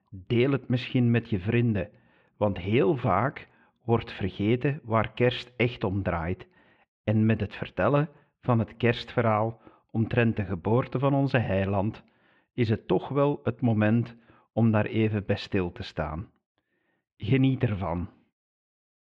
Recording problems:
muffled; very; fading above 3 kHz

